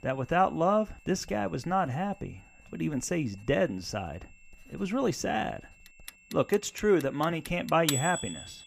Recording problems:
household noises; loud; throughout; 8 dB below the speech
high-pitched whine; faint; throughout; 2.5 kHz, 30 dB below the speech

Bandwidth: 15 kHz